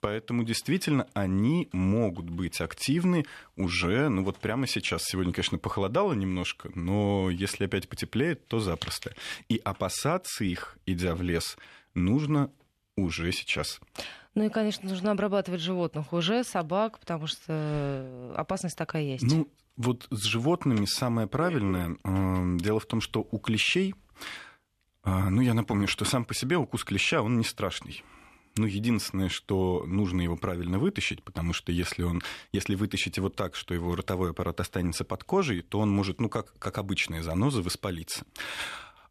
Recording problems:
none

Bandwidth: 13.5 kHz